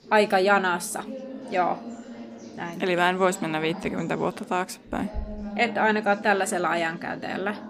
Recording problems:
chatter from many people; noticeable; throughout; 15 dB below the speech

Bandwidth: 15 kHz